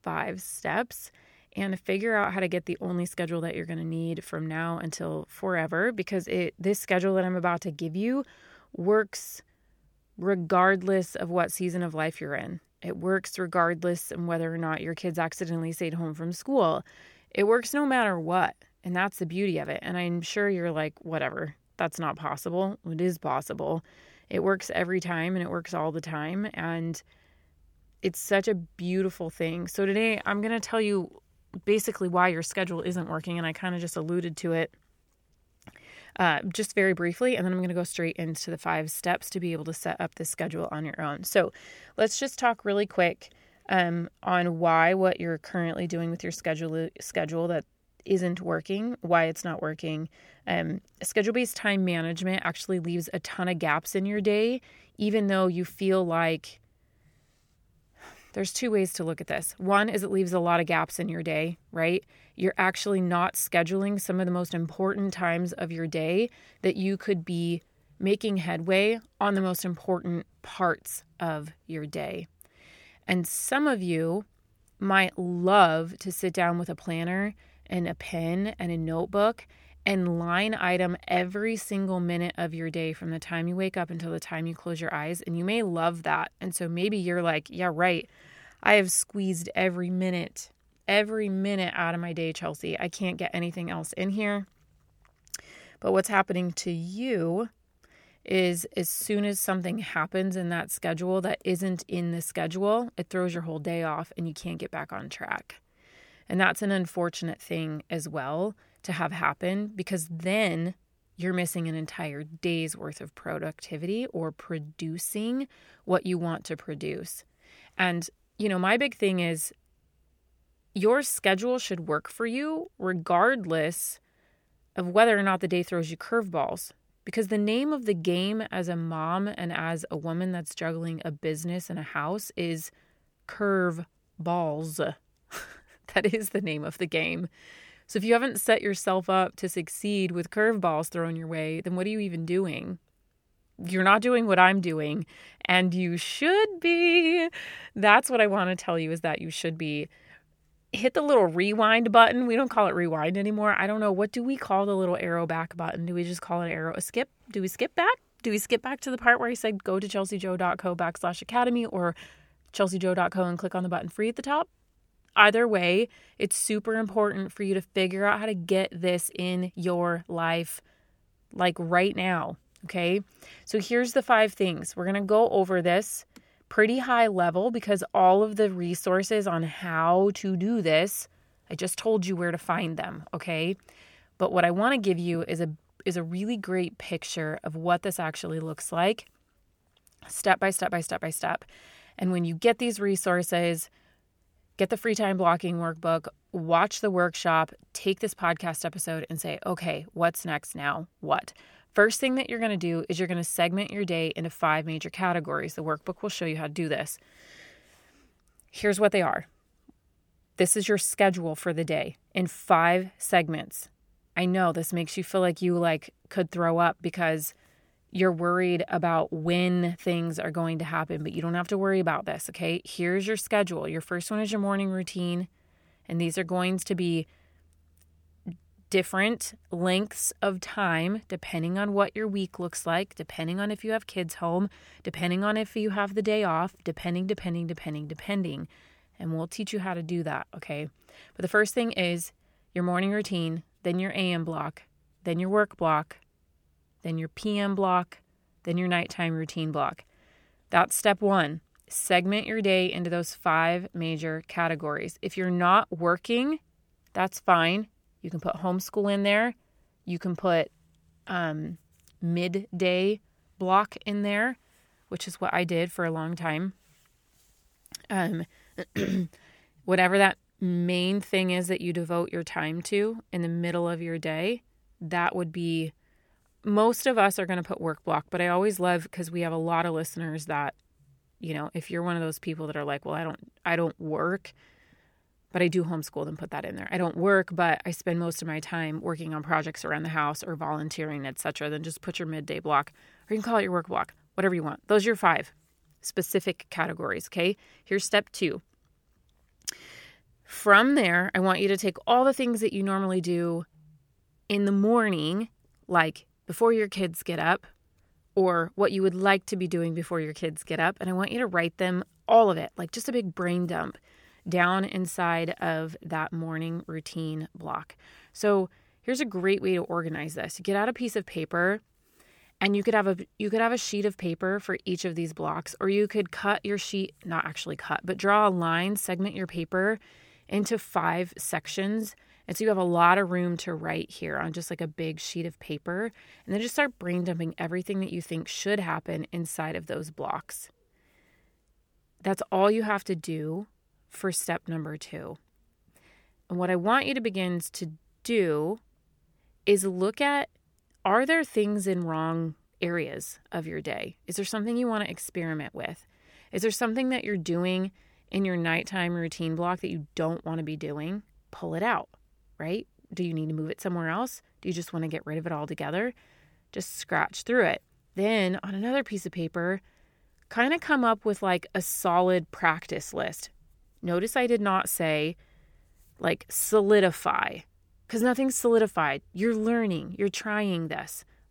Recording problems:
none

